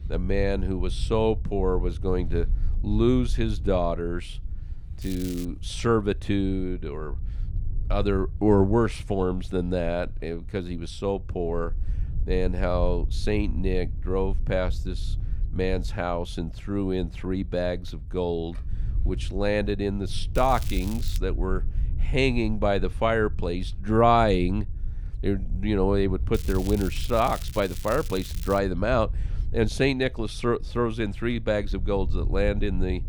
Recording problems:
crackling; noticeable; at 5 s, at 20 s and from 26 to 29 s; 15 dB below the speech
low rumble; faint; throughout; 25 dB below the speech

